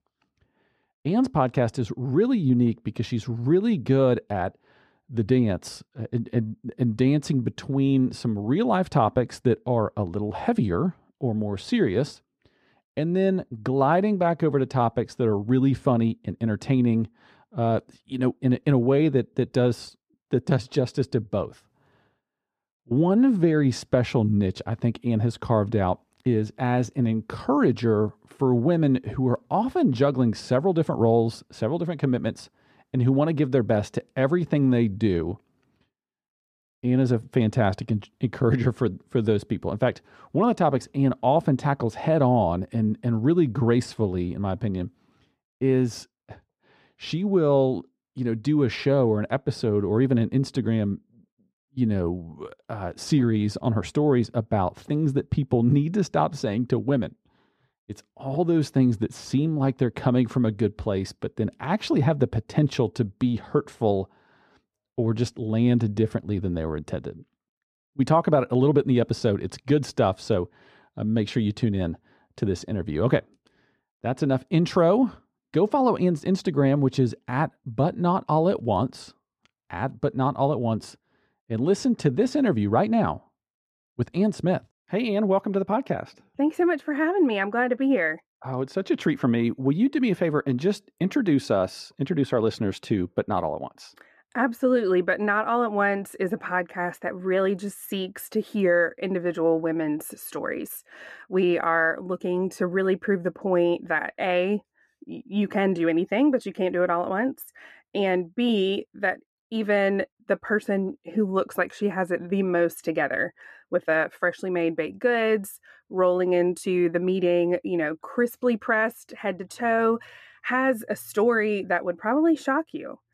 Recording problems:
muffled; slightly; fading above 2.5 kHz

